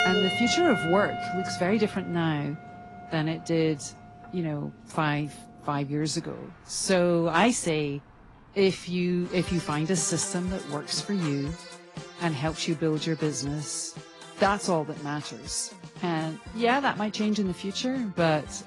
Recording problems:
garbled, watery; slightly
background music; loud; throughout; 10 dB below the speech
traffic noise; noticeable; until 9.5 s; 15 dB below the speech

